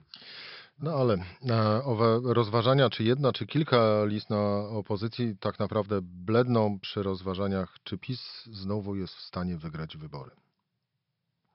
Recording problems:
high frequencies cut off; noticeable; nothing above 5.5 kHz

